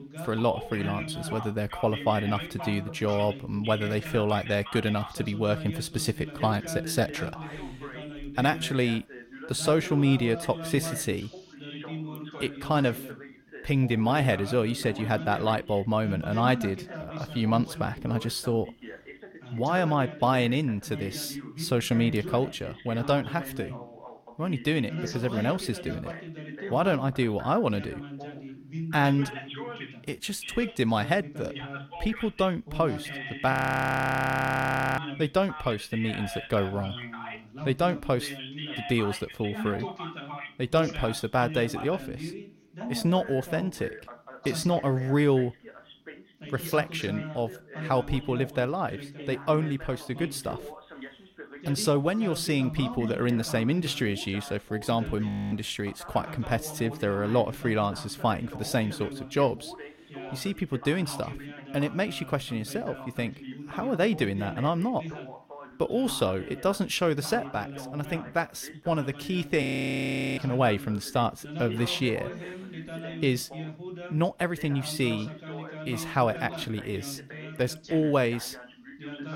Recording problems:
background chatter; noticeable; throughout; 2 voices, 10 dB below the speech
audio freezing; at 34 s for 1.5 s, at 55 s and at 1:10 for 0.5 s

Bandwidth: 16.5 kHz